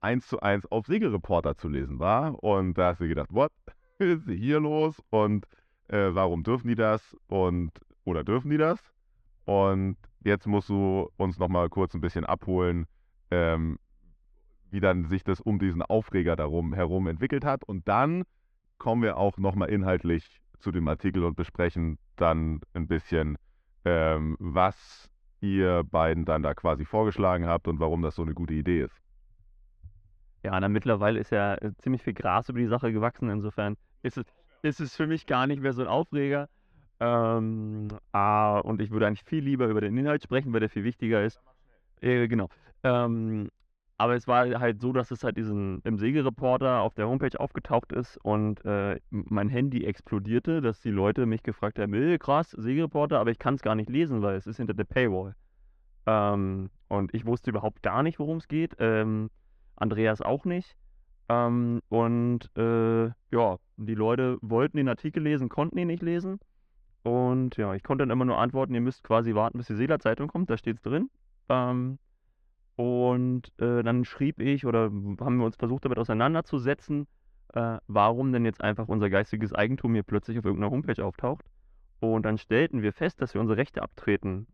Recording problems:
muffled; slightly; fading above 2.5 kHz

